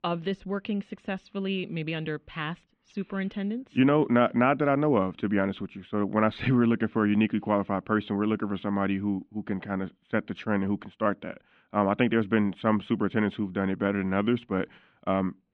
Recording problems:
muffled; very; fading above 3 kHz

